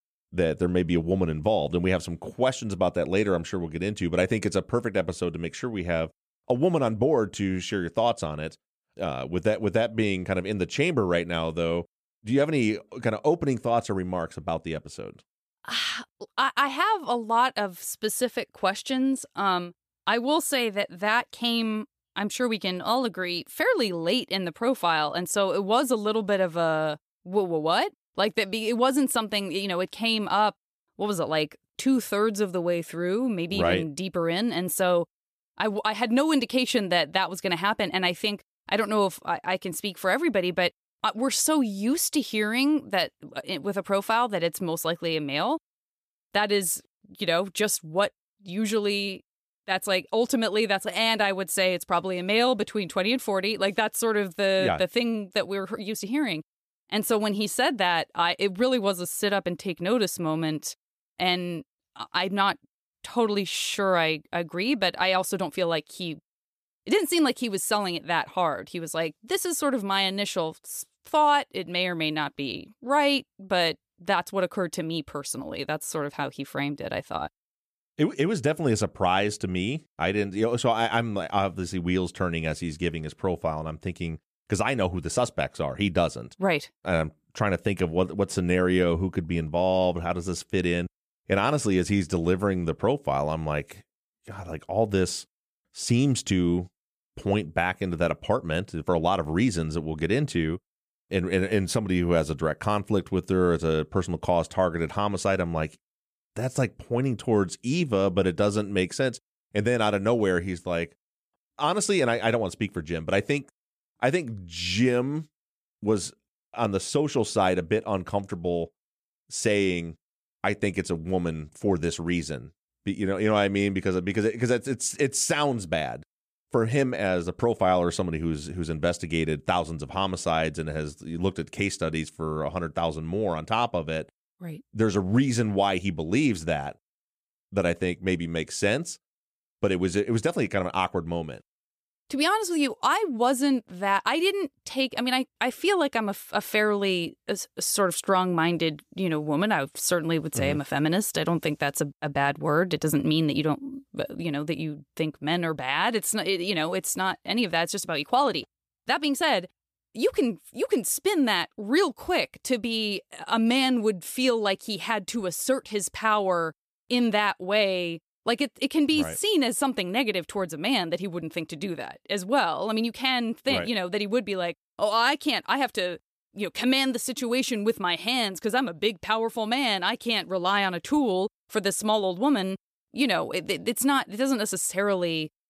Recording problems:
none

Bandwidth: 14.5 kHz